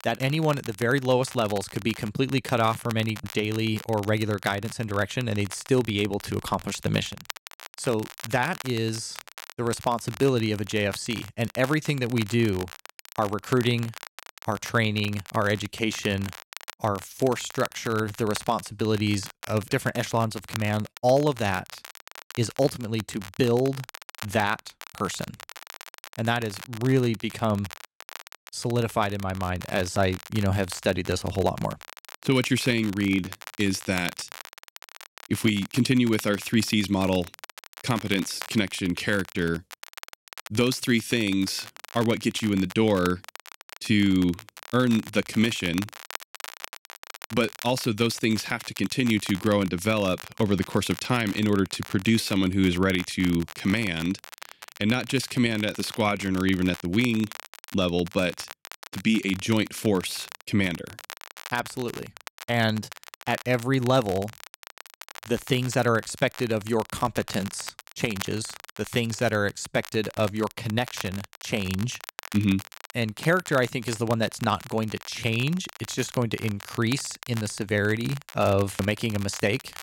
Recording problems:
crackle, like an old record; noticeable; 15 dB below the speech

